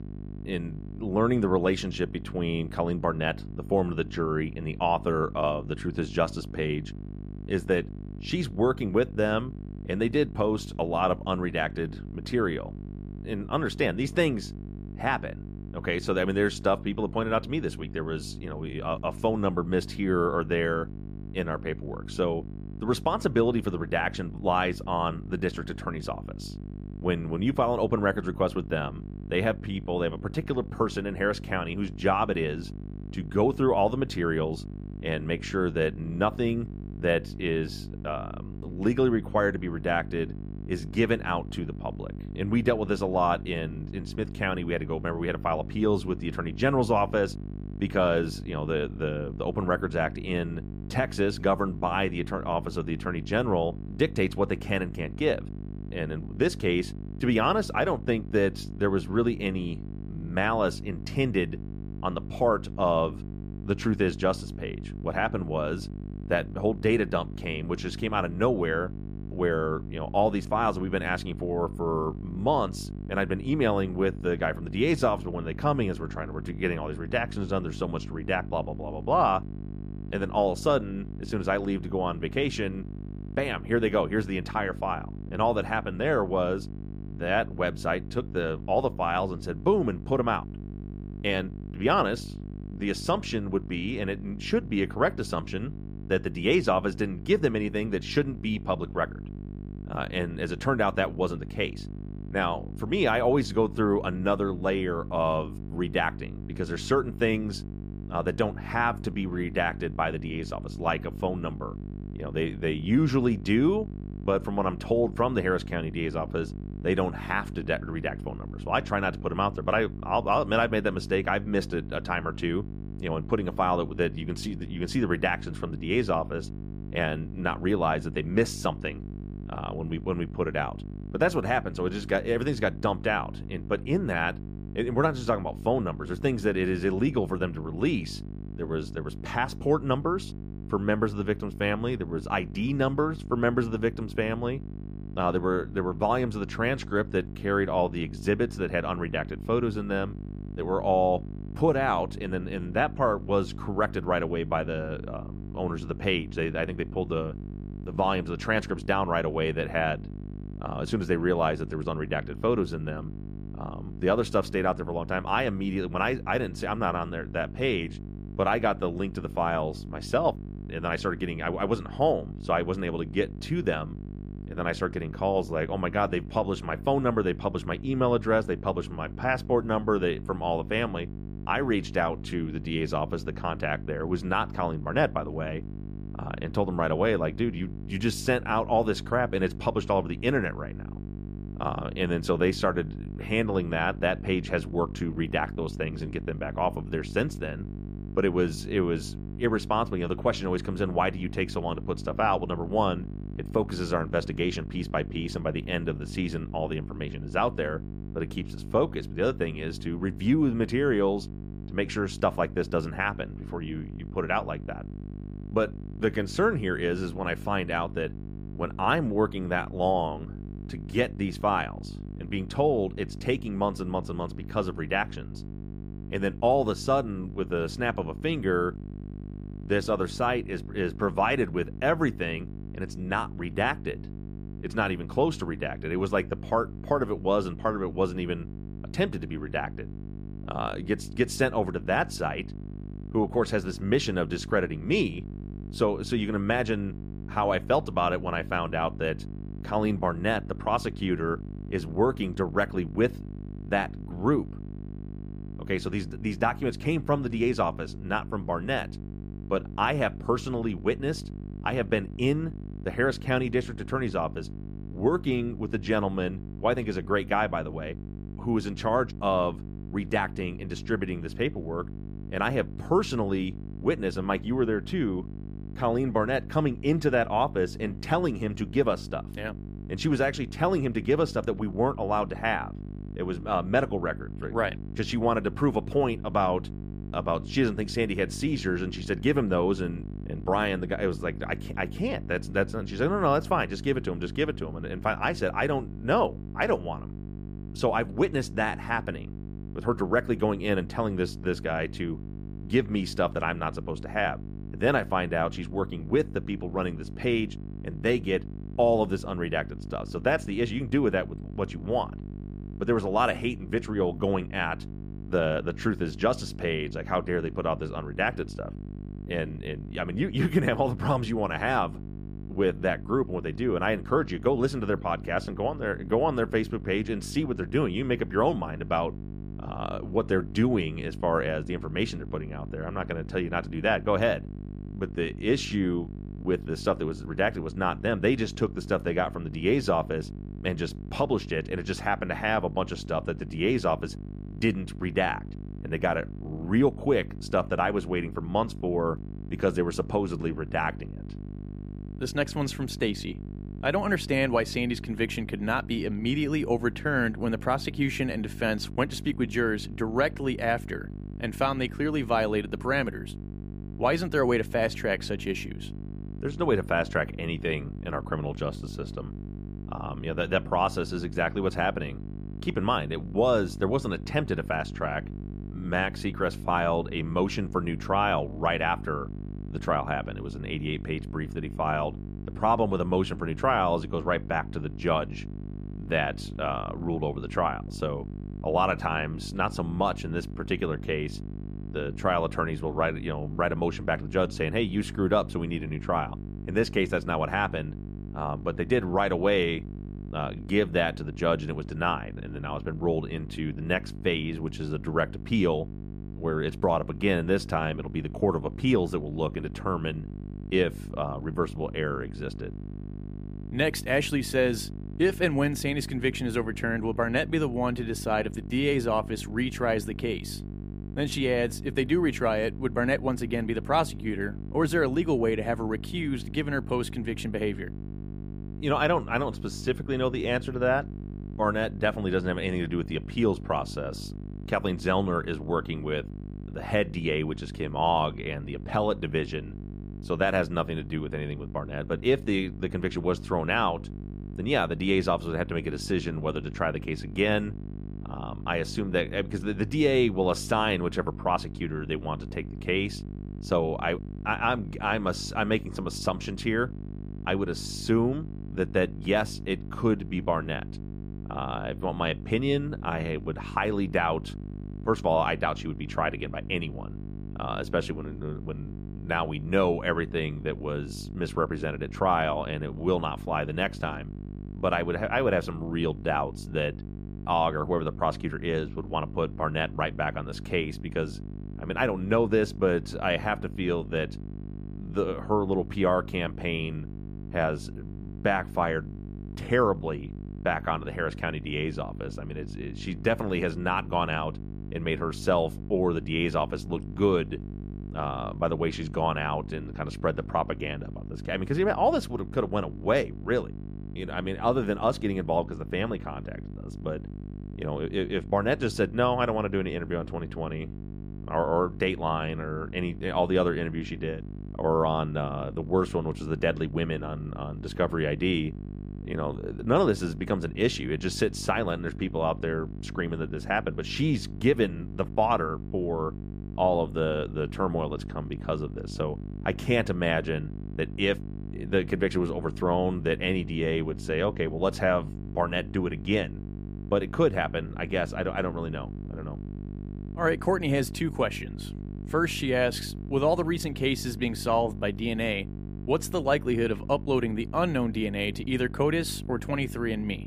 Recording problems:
electrical hum; noticeable; throughout; 50 Hz, 20 dB below the speech

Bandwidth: 15 kHz